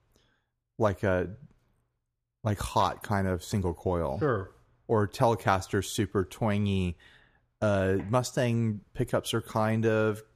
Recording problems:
none

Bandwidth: 14.5 kHz